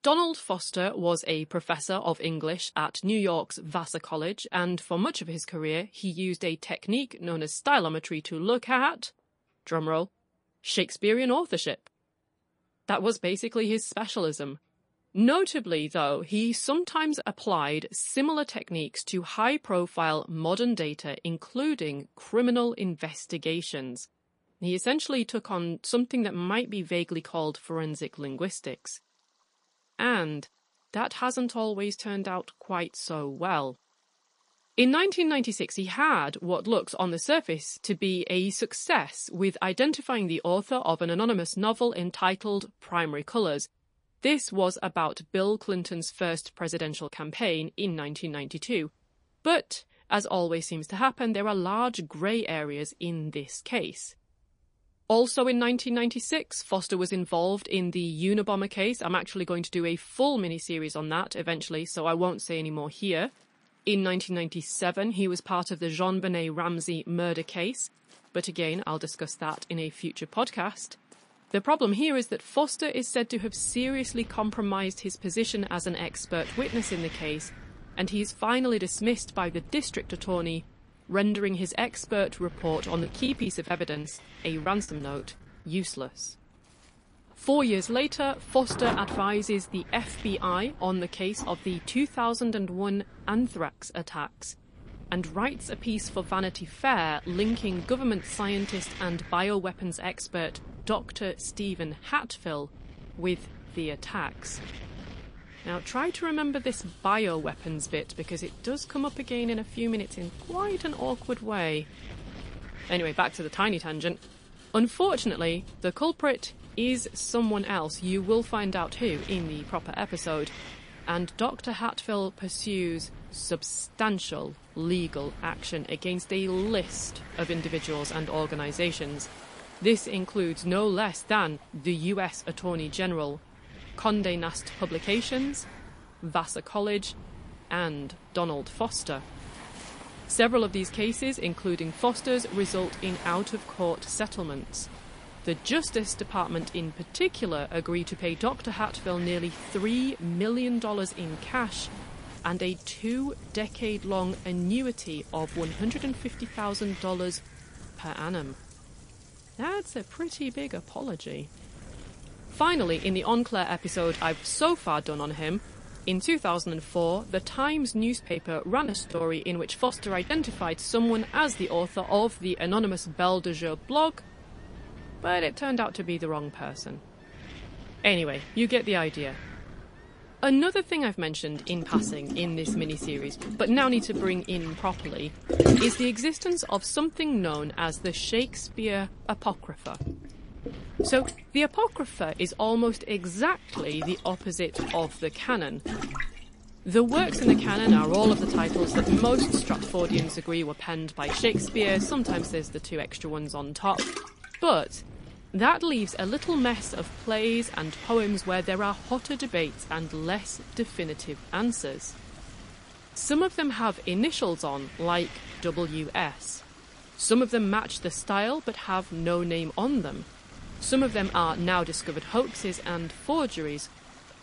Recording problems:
garbled, watery; slightly; nothing above 10.5 kHz
rain or running water; loud; throughout; 6 dB below the speech
wind noise on the microphone; occasional gusts; from 1:13 on; 20 dB below the speech
choppy; very; from 1:23 to 1:25 and from 2:48 to 2:50; 10% of the speech affected

